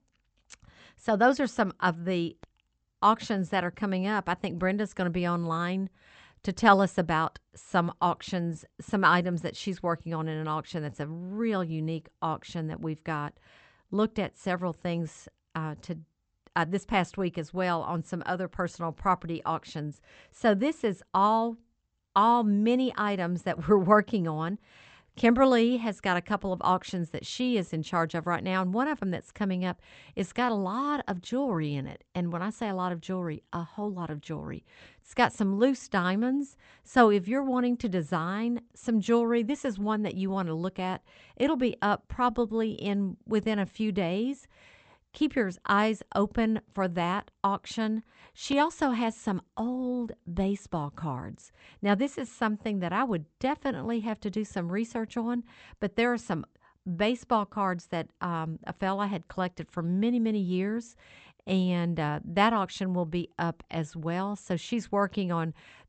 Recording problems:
high frequencies cut off; noticeable; nothing above 8 kHz

